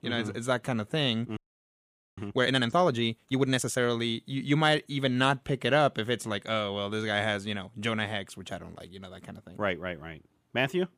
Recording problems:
audio freezing; at 1.5 s for 1 s

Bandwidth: 15 kHz